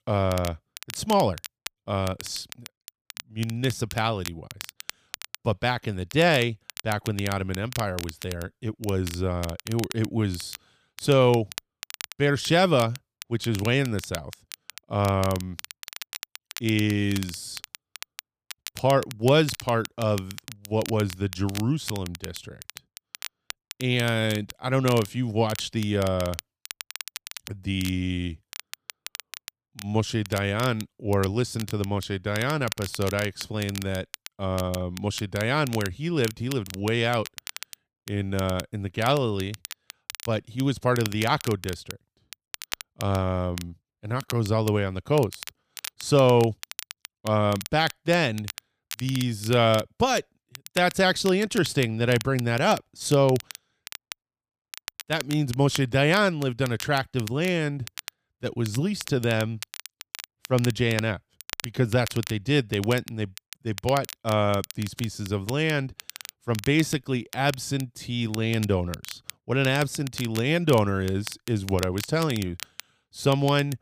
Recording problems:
crackle, like an old record; noticeable; 15 dB below the speech

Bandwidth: 15 kHz